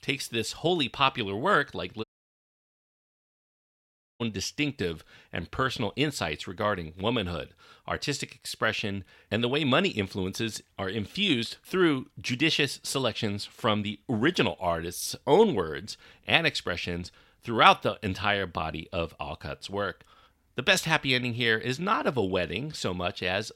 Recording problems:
audio cutting out; at 2 s for 2 s

